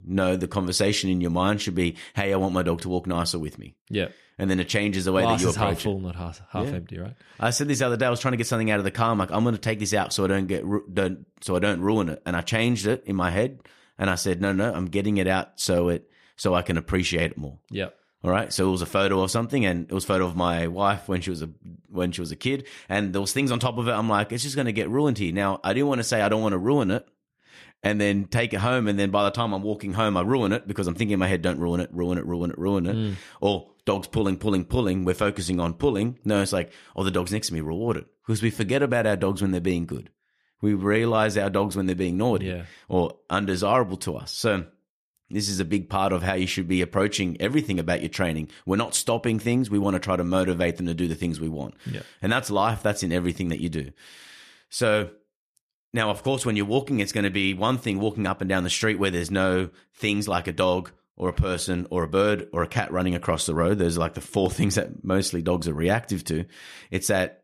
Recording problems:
none

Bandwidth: 14.5 kHz